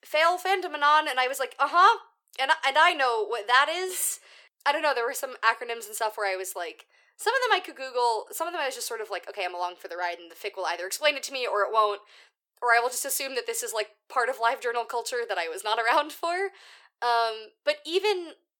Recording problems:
thin; very; fading below 400 Hz

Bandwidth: 17.5 kHz